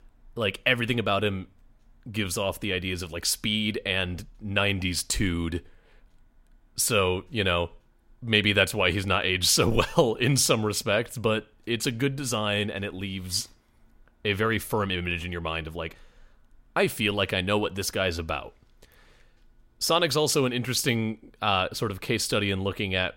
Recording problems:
none

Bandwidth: 16 kHz